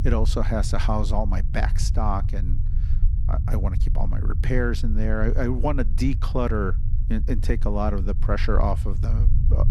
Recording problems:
low rumble; noticeable; throughout; 15 dB below the speech

